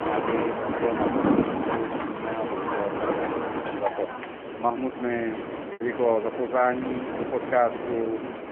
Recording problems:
phone-call audio; poor line
animal sounds; loud; until 4 s; 2 dB below the speech
wind in the background; loud; throughout; 3 dB below the speech
choppy; occasionally; 1% of the speech affected

